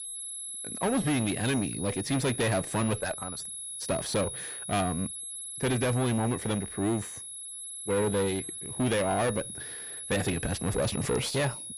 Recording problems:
distortion; heavy; 5 dB below the speech
high-pitched whine; loud; throughout; 11 kHz, 7 dB below the speech

